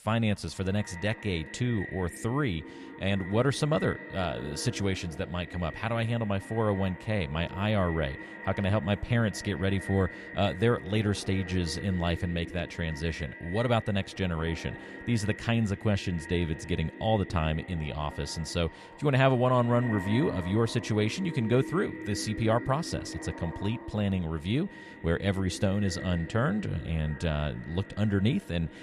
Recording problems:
echo of what is said; noticeable; throughout; 200 ms later, 10 dB below the speech

